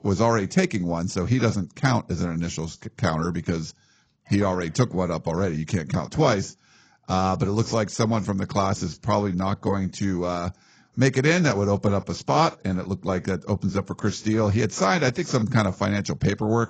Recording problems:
garbled, watery; badly; nothing above 7.5 kHz

